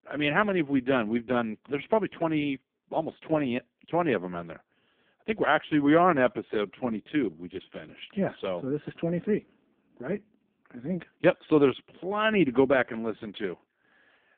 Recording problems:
phone-call audio; poor line

